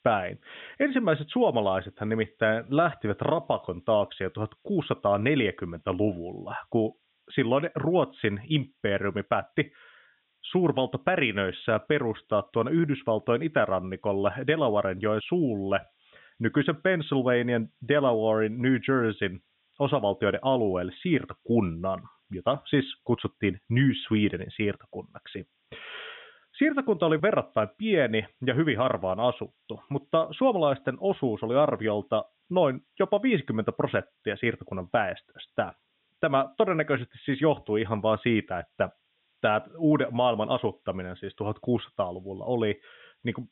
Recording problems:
high frequencies cut off; severe; nothing above 3.5 kHz
hiss; very faint; throughout; 45 dB below the speech

